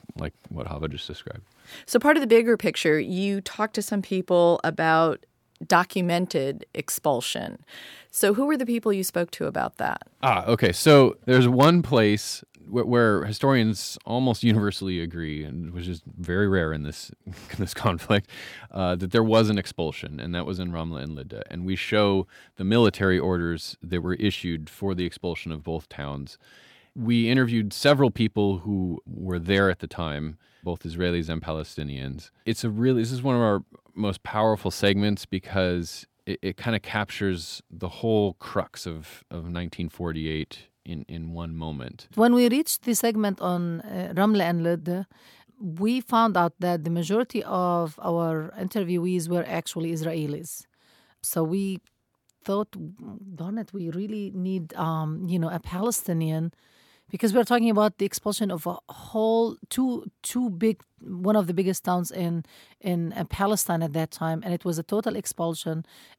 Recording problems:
none

